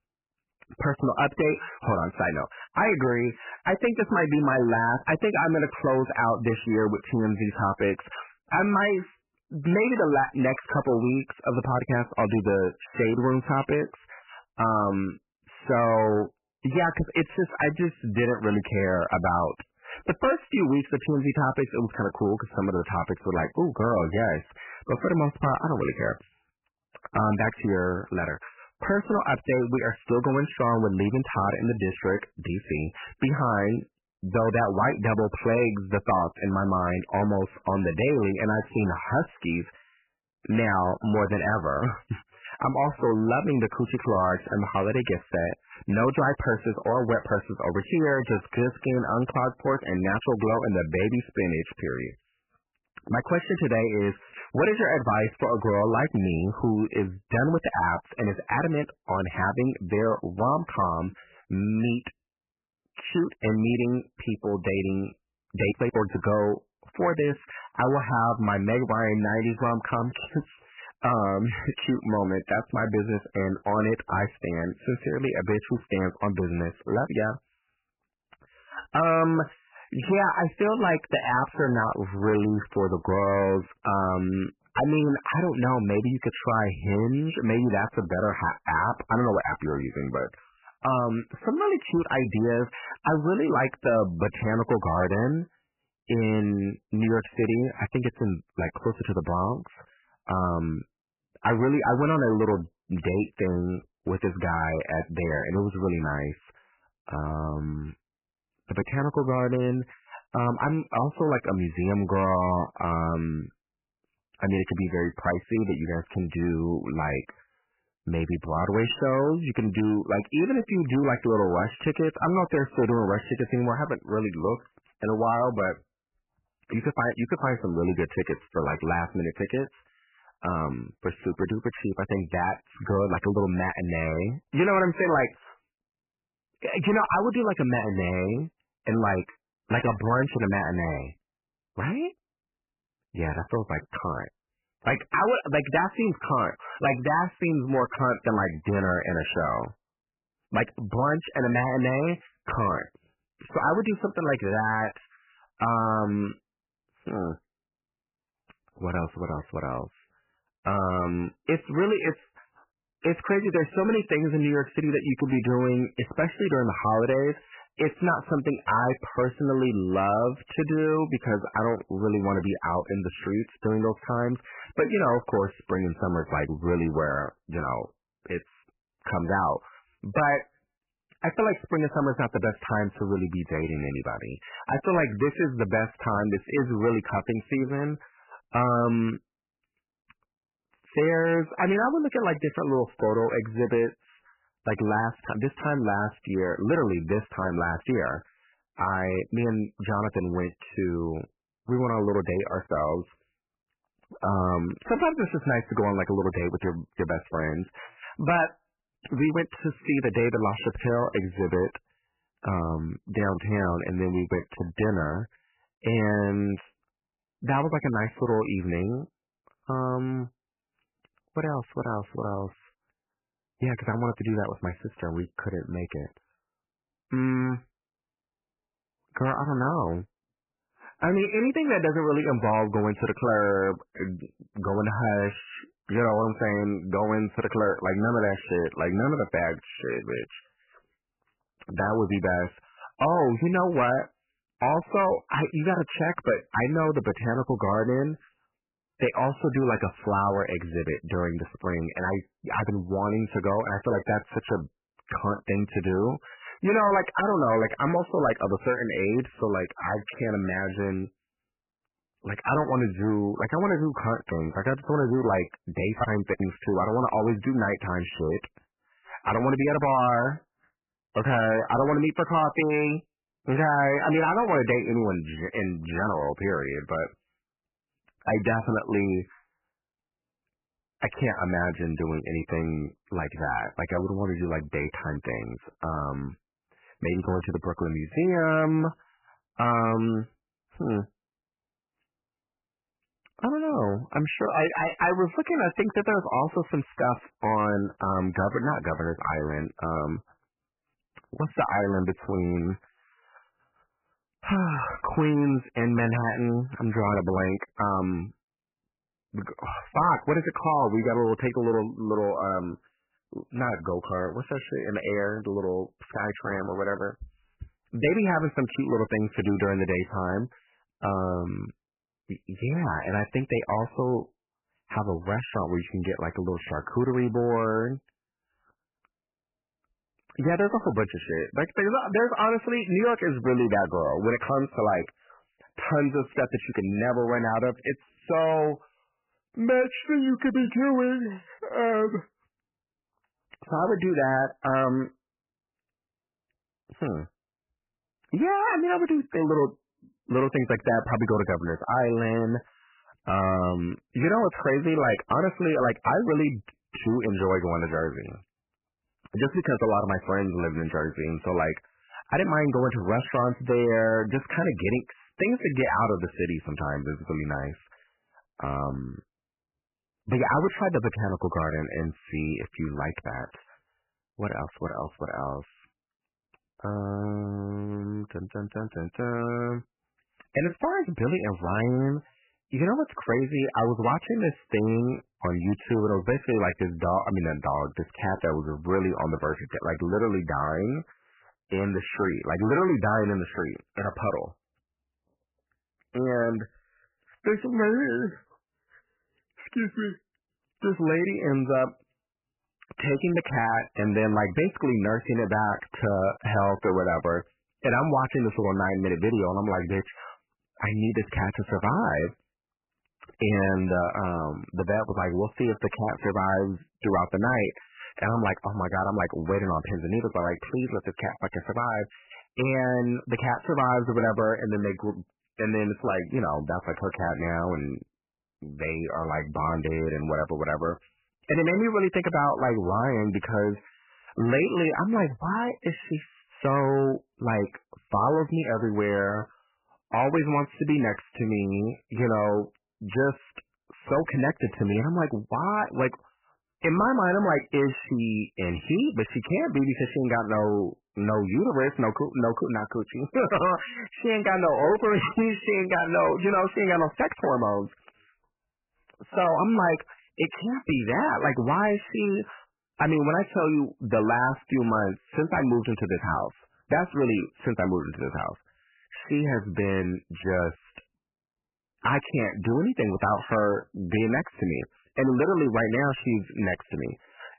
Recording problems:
garbled, watery; badly; nothing above 3 kHz
distortion; slight; 4% of the sound clipped

